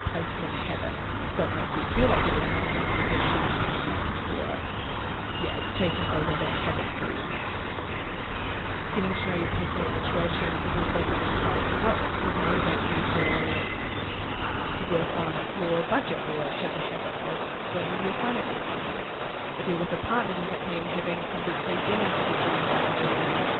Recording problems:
garbled, watery; badly; nothing above 4 kHz
rain or running water; very loud; throughout; 3 dB above the speech

